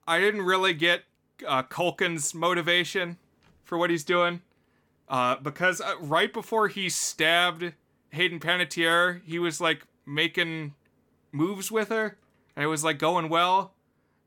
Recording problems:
none

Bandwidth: 18 kHz